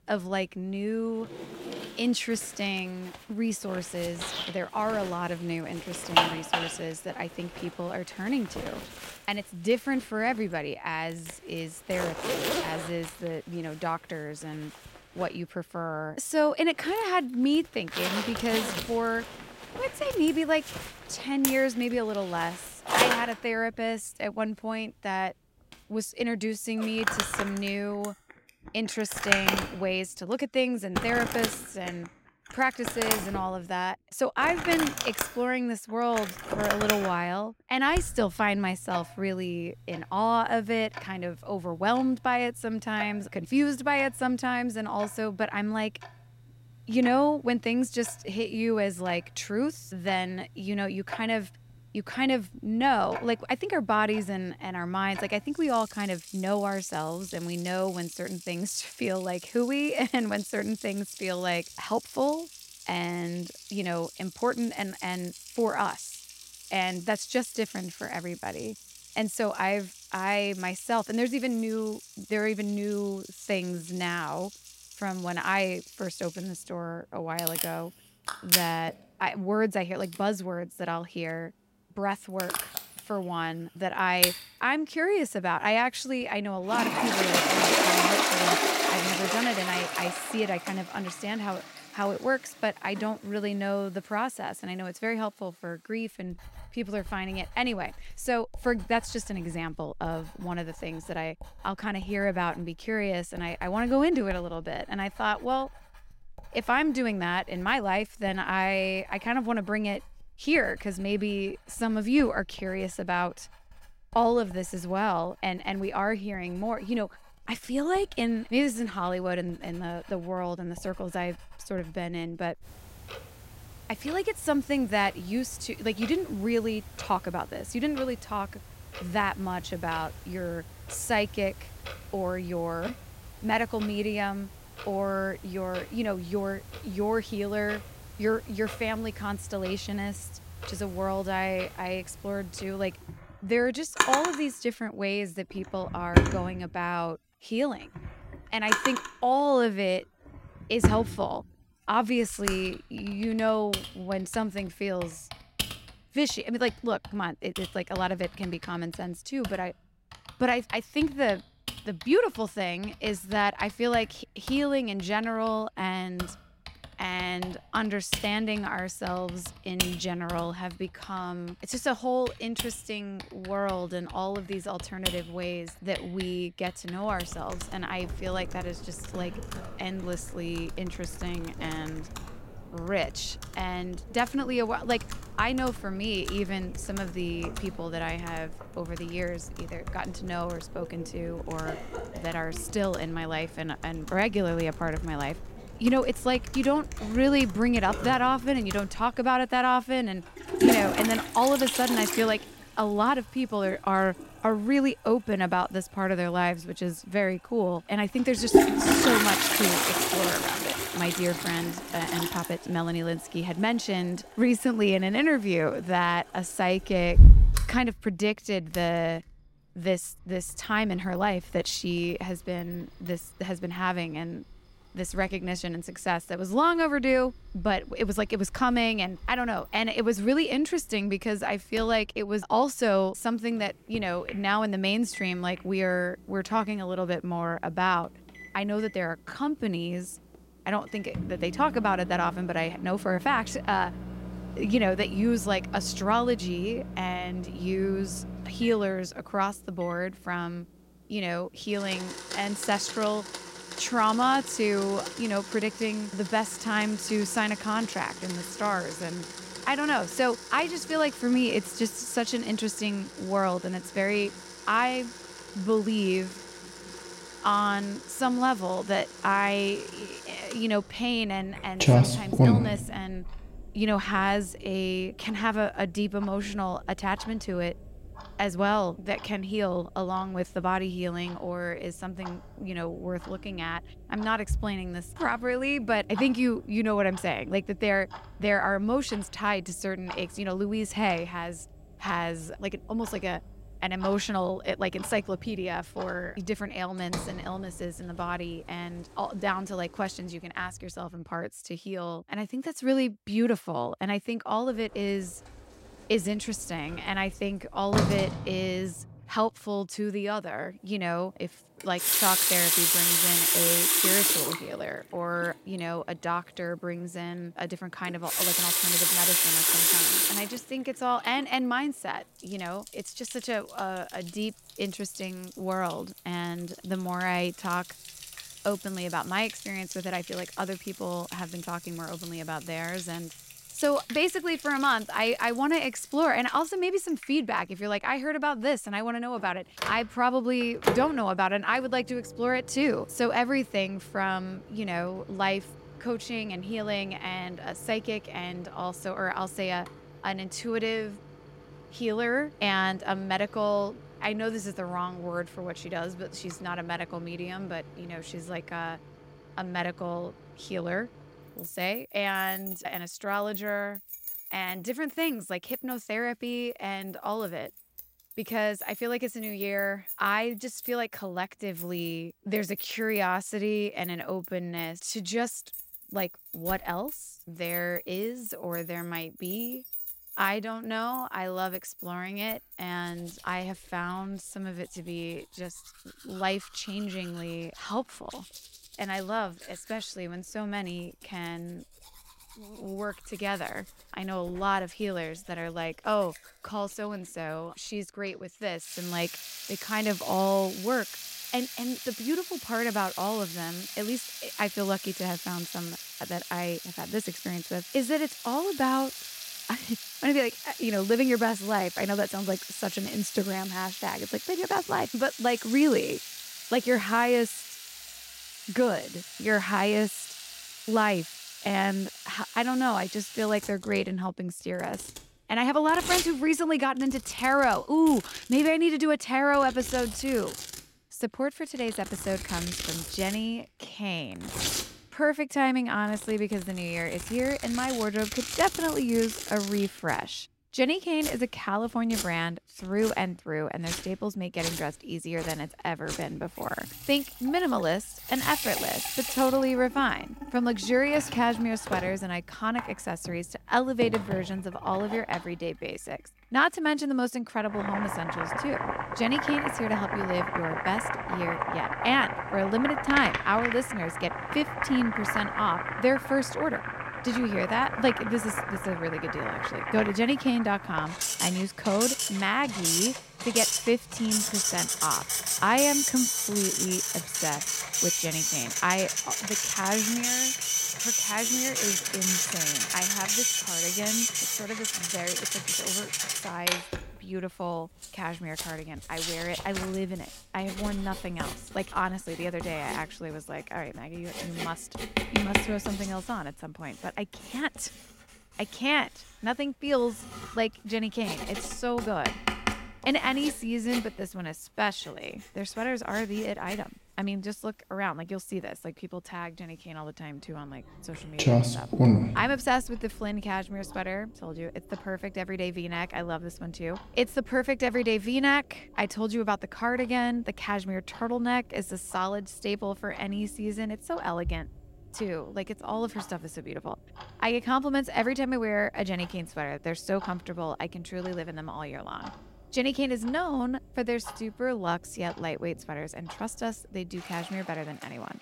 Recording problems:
household noises; loud; throughout; 1 dB below the speech

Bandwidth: 16 kHz